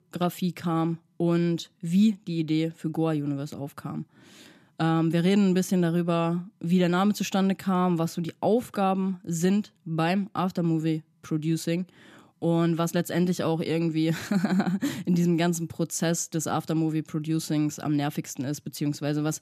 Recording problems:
none

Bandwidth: 14.5 kHz